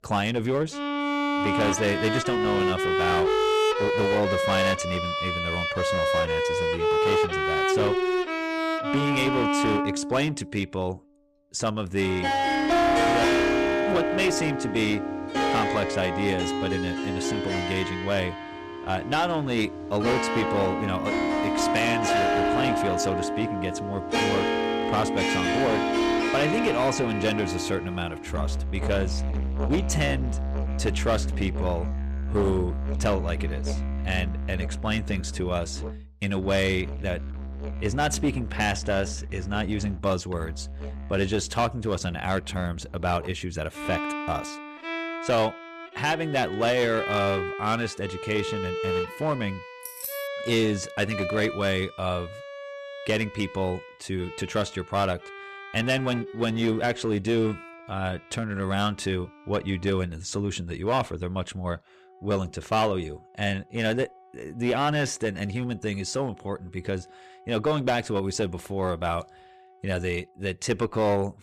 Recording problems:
distortion; slight; 8% of the sound clipped
background music; very loud; throughout; 1 dB above the speech
jangling keys; noticeable; at 50 s; peak 6 dB below the speech

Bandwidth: 14.5 kHz